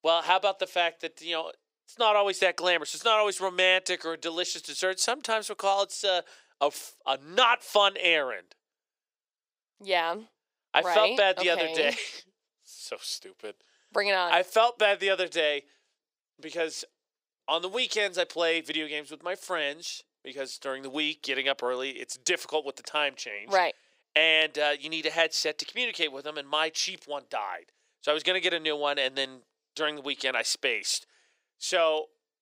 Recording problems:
thin; very; fading below 450 Hz

